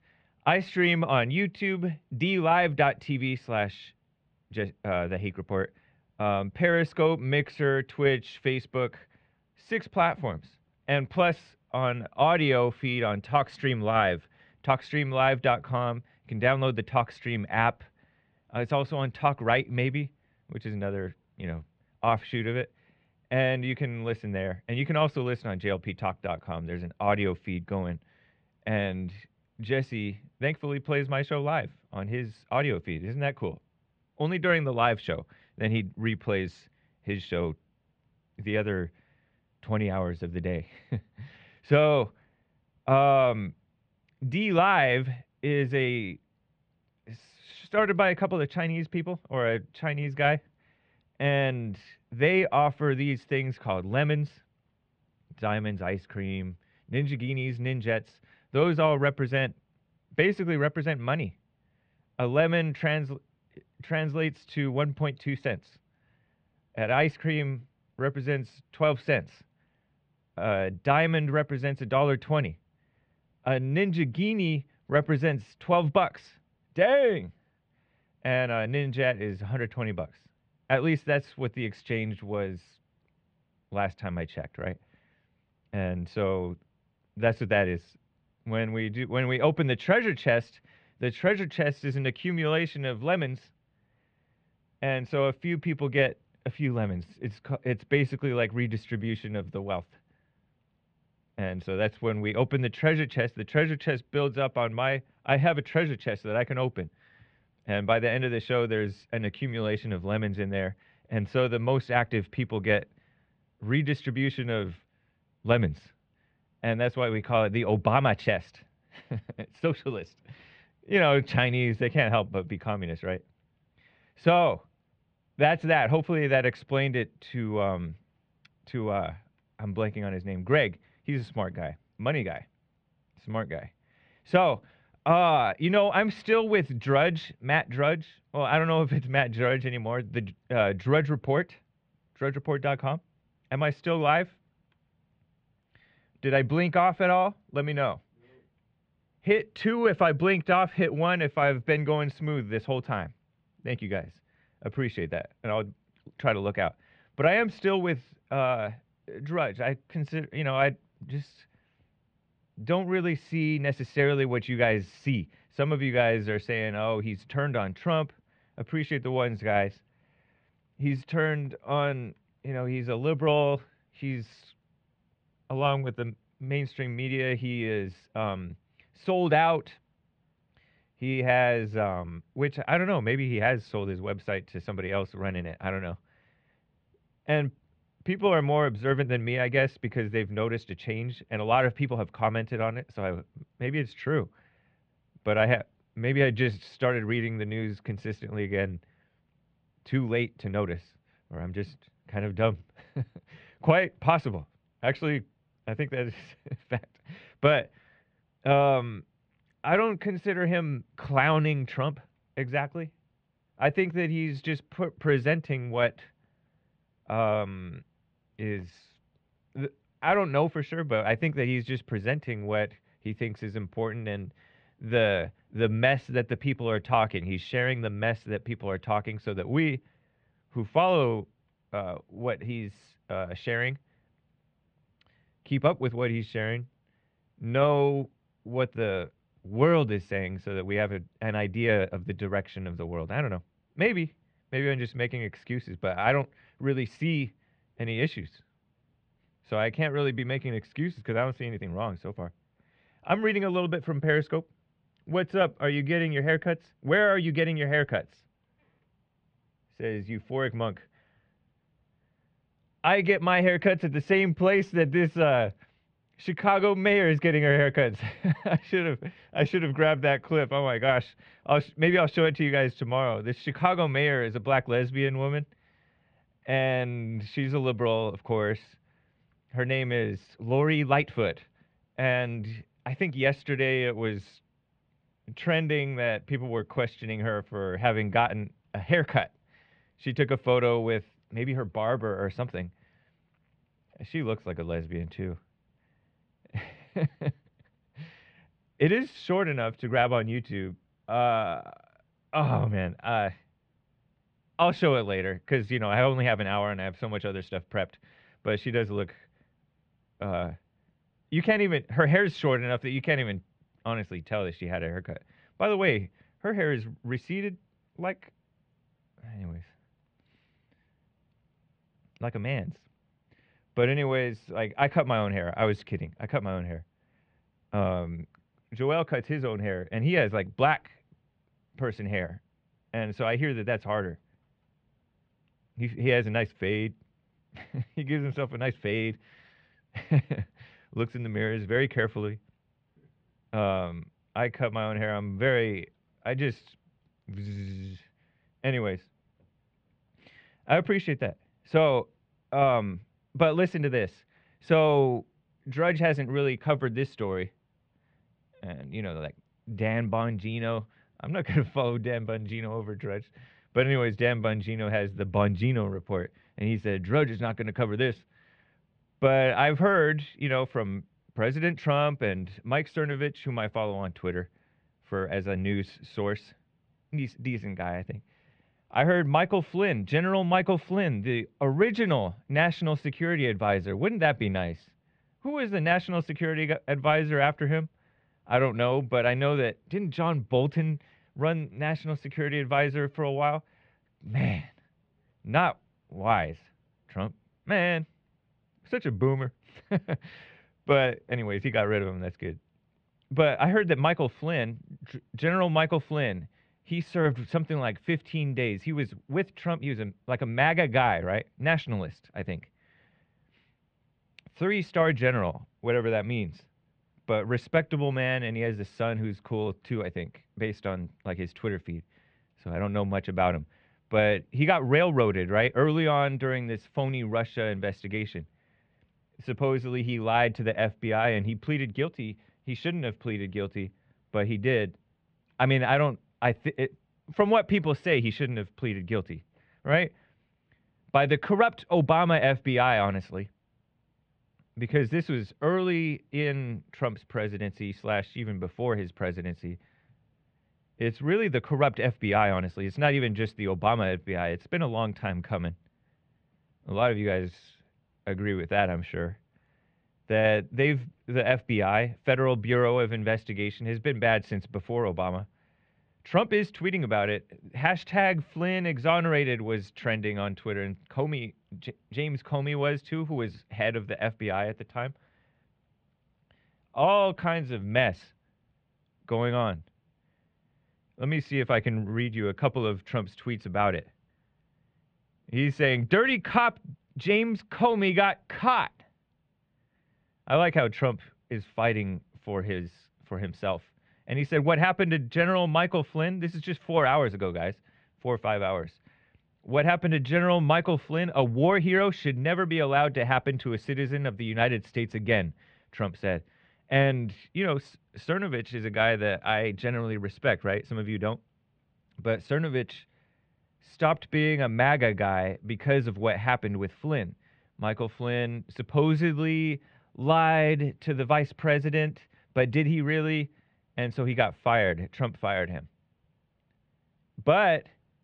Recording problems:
muffled; very; fading above 3 kHz

